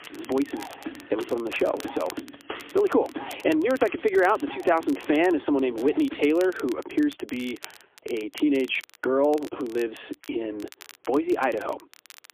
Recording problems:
phone-call audio; poor line; nothing above 3.5 kHz
squashed, flat; heavily, background pumping
background music; noticeable; throughout; 15 dB below the speech
crackle, like an old record; faint; 20 dB below the speech

